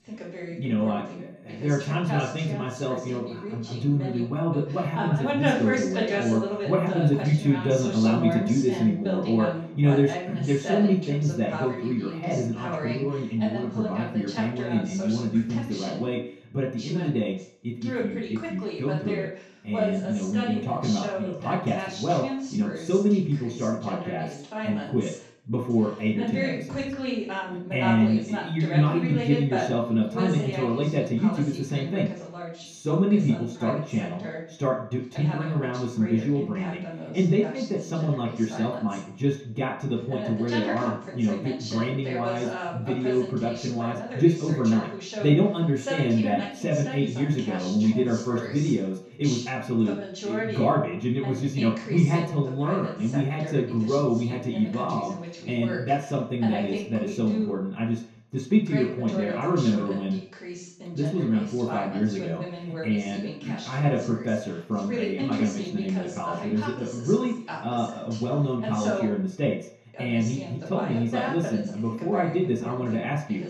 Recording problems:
off-mic speech; far
room echo; slight; dies away in 0.5 s
voice in the background; loud; throughout; 8 dB below the speech

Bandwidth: 15.5 kHz